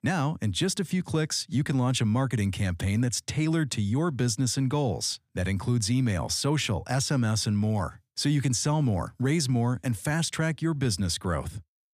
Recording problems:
none

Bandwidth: 15 kHz